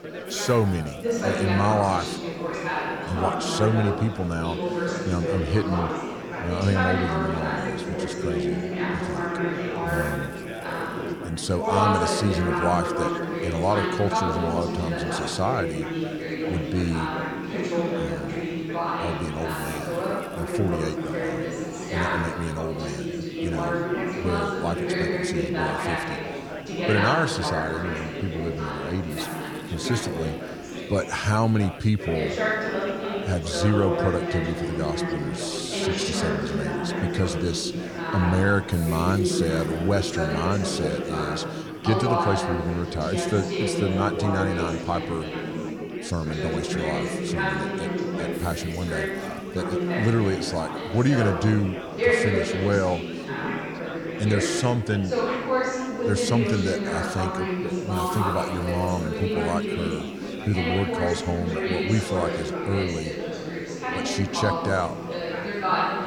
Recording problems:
chatter from many people; loud; throughout; 1 dB below the speech
hiss; faint; throughout; 25 dB below the speech

